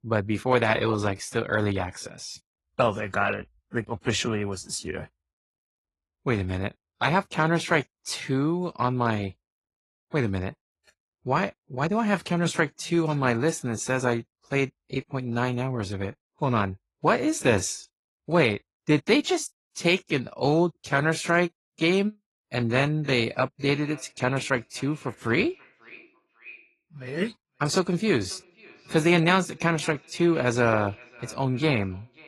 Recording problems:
echo of what is said; faint; from 24 s on; 540 ms later, 20 dB below the speech
garbled, watery; slightly; nothing above 11.5 kHz

